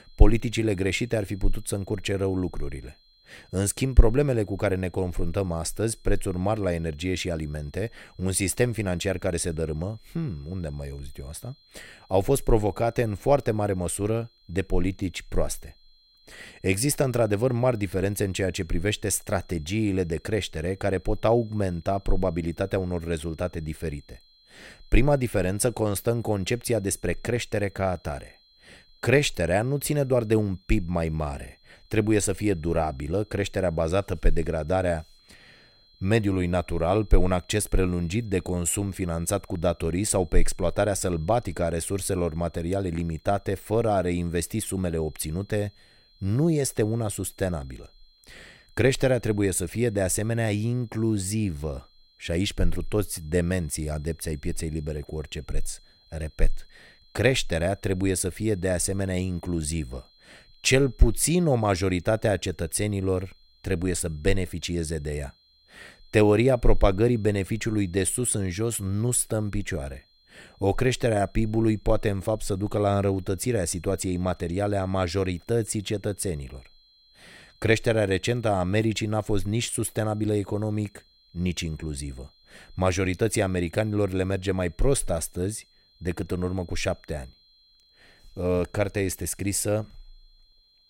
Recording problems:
high-pitched whine; faint; throughout; 4 kHz, 30 dB below the speech

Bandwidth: 16 kHz